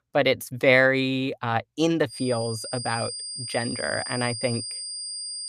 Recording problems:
high-pitched whine; loud; from 2 s on; 5 kHz, 7 dB below the speech

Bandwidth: 14.5 kHz